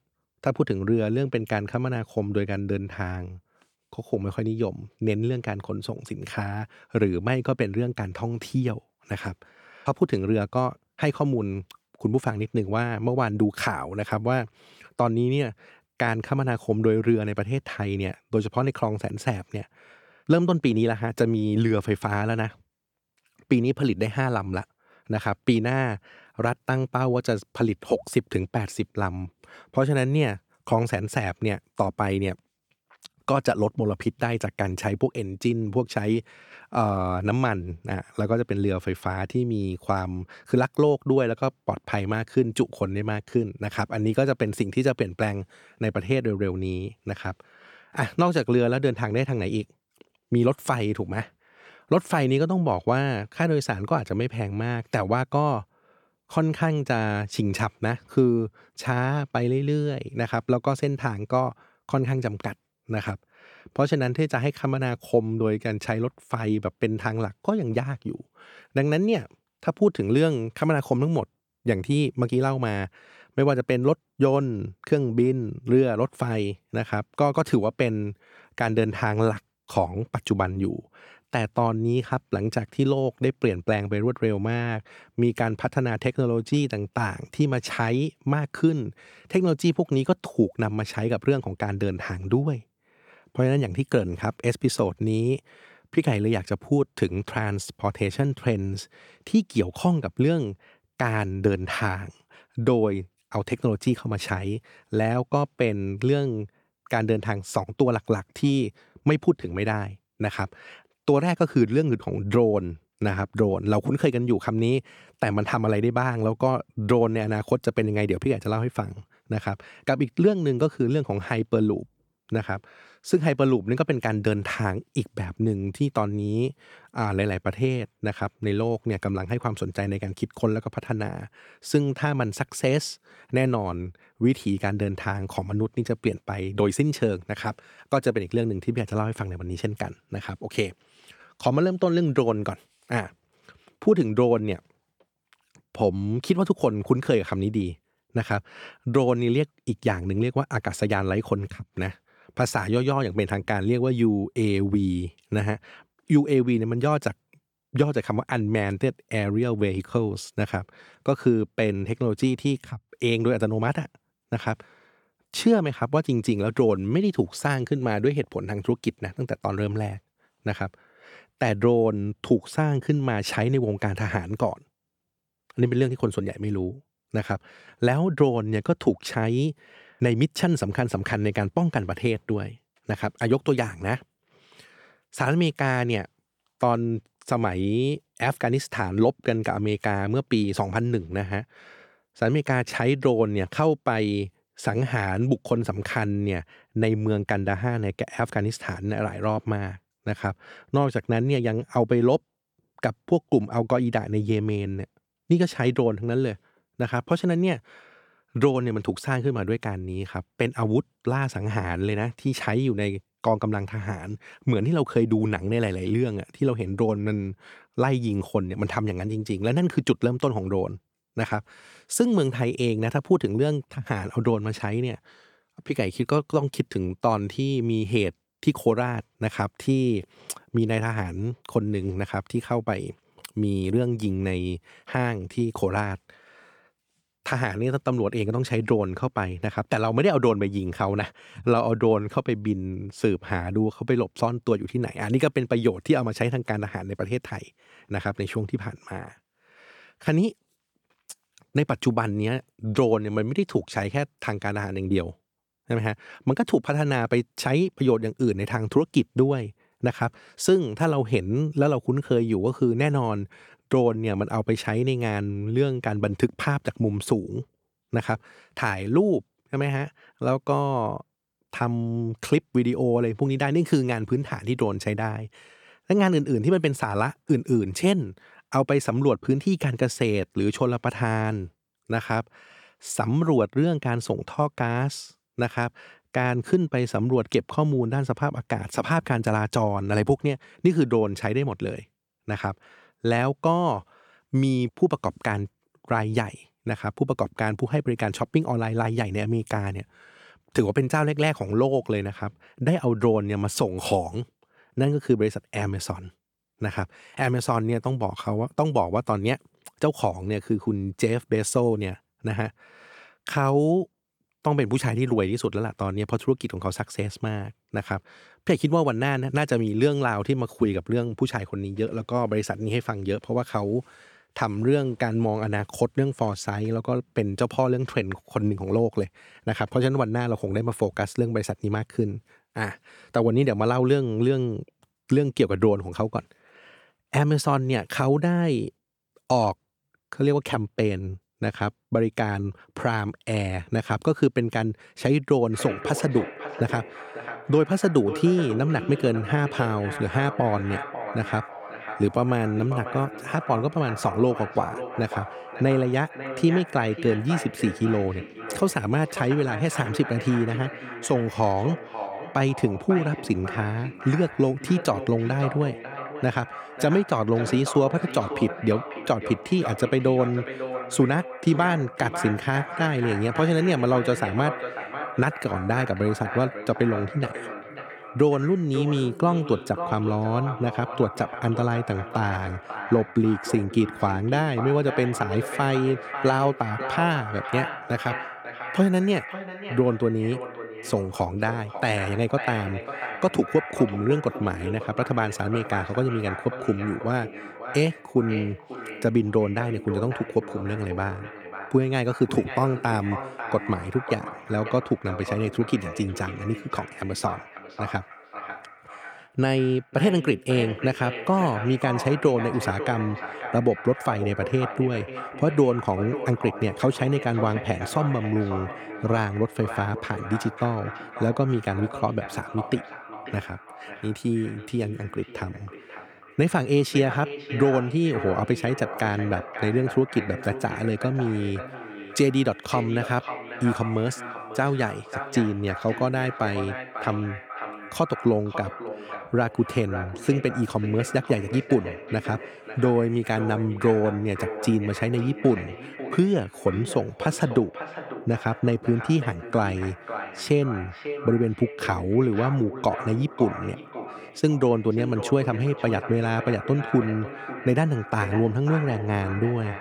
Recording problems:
echo of what is said; strong; from 5:45 on; 550 ms later, 10 dB below the speech

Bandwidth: 18.5 kHz